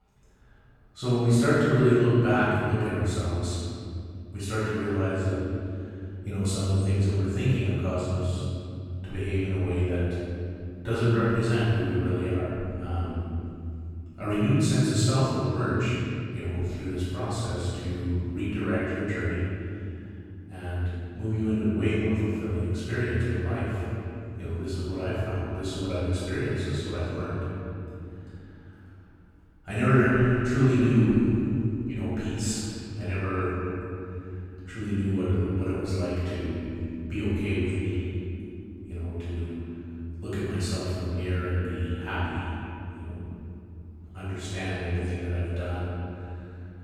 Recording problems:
room echo; strong; dies away in 3 s
off-mic speech; far
echo of what is said; noticeable; from 23 s on; 260 ms later, 15 dB below the speech

